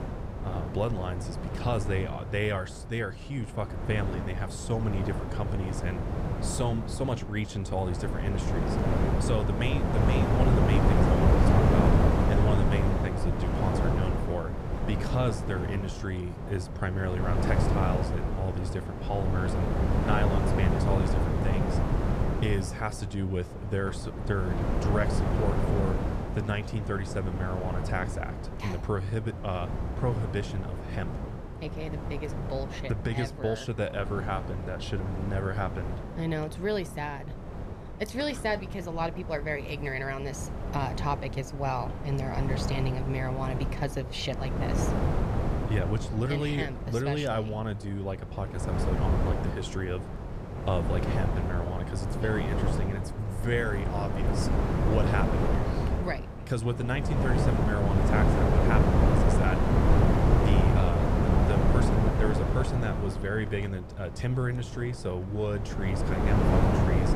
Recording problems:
wind noise on the microphone; heavy; 1 dB above the speech

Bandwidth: 14.5 kHz